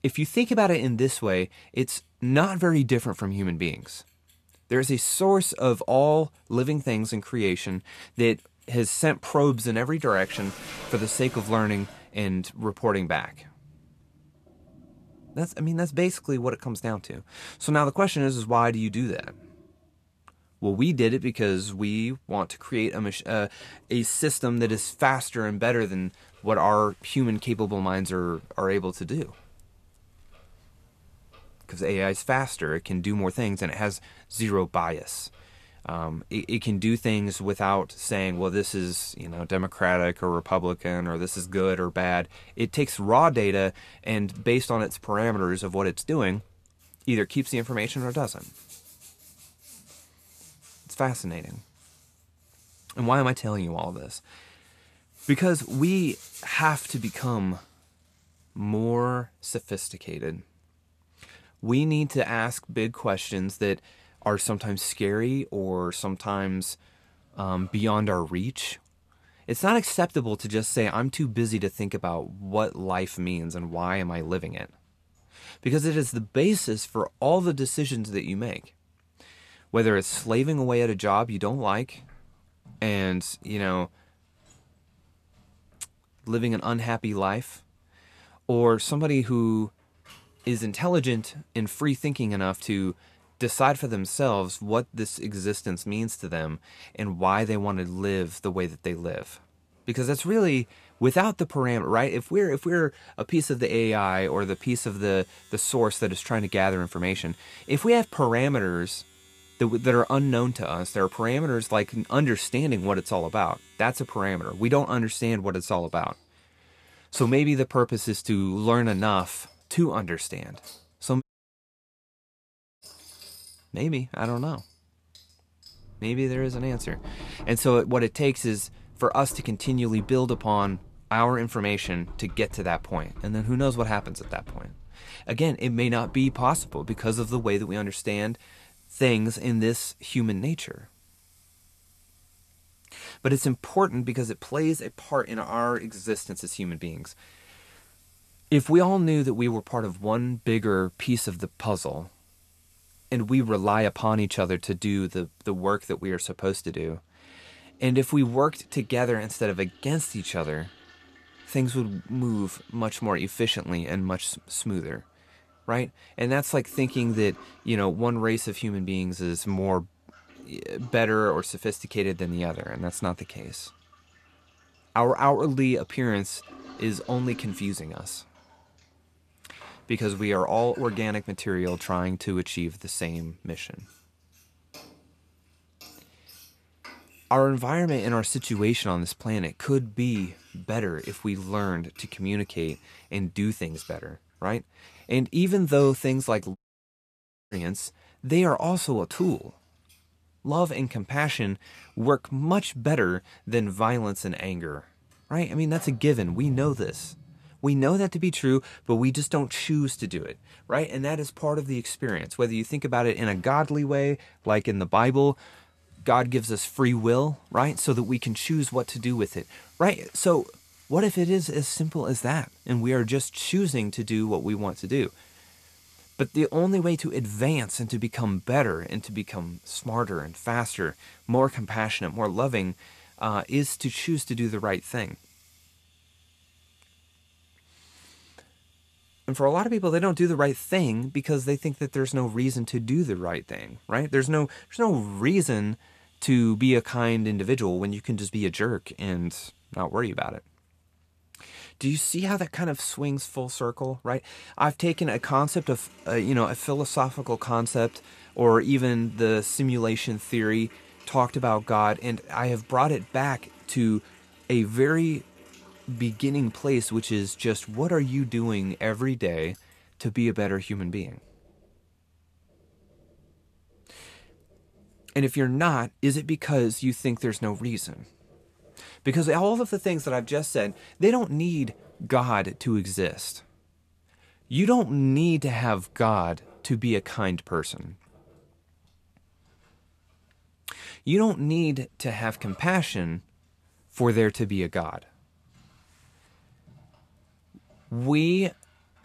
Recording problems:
household noises; faint; throughout; 25 dB below the speech
audio cutting out; at 2:01 for 1.5 s and at 3:17 for 1 s

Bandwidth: 14 kHz